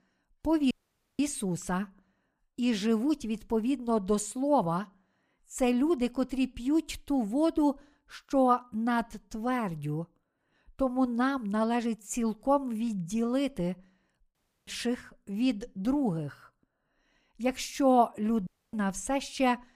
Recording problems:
audio cutting out; at 0.5 s, at 14 s and at 18 s

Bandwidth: 15 kHz